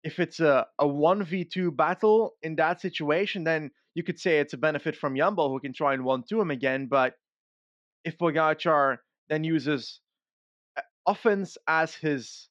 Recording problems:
muffled; slightly; fading above 3.5 kHz

